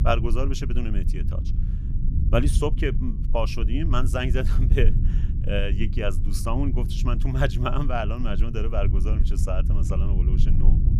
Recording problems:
low rumble; noticeable; throughout; 10 dB below the speech

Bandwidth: 15 kHz